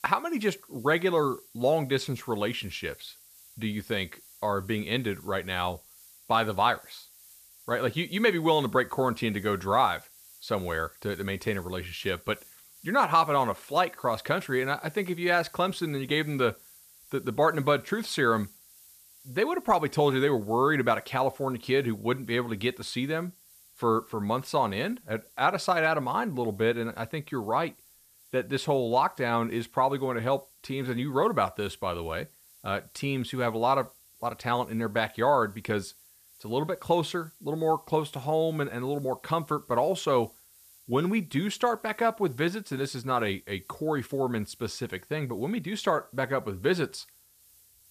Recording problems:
hiss; faint; throughout; 25 dB below the speech

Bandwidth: 14.5 kHz